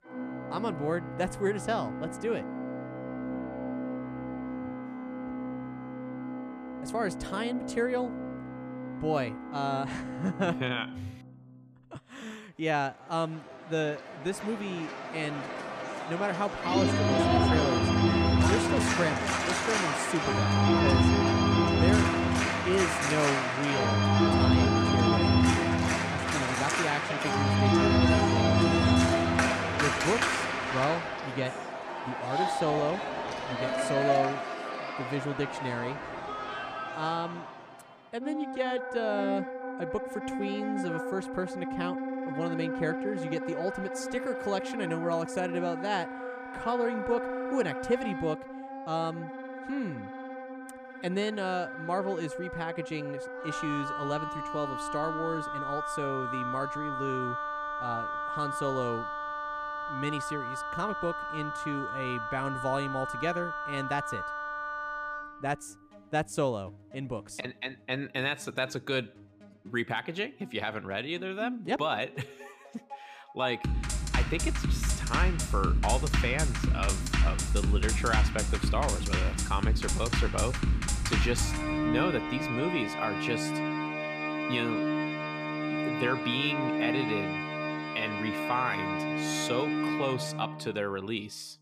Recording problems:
background music; very loud; throughout; 3 dB above the speech

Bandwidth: 14.5 kHz